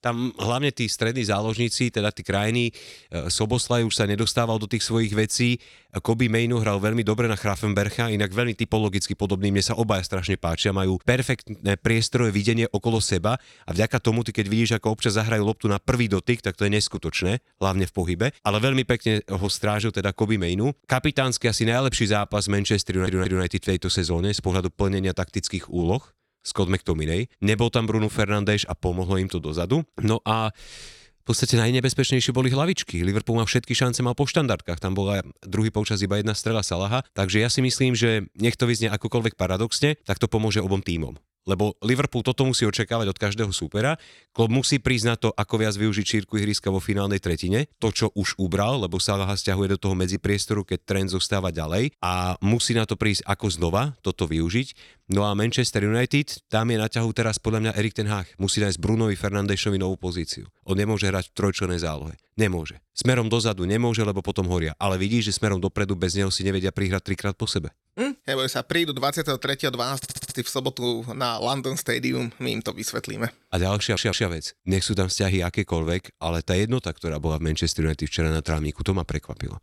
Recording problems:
audio stuttering; at 23 s, at 1:10 and at 1:14

